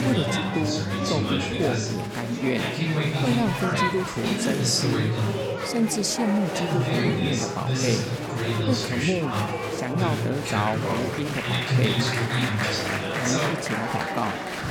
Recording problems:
murmuring crowd; very loud; throughout; 3 dB above the speech

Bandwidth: 18.5 kHz